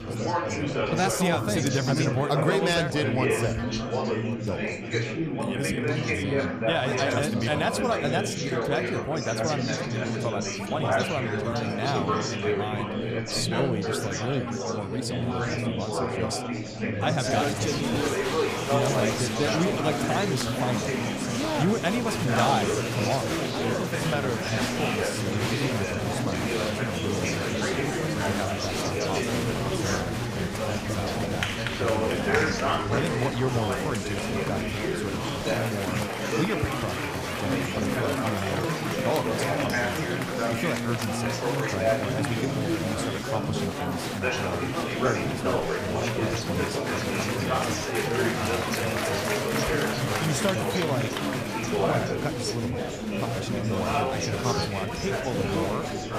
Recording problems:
chatter from many people; very loud; throughout; 4 dB above the speech

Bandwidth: 15 kHz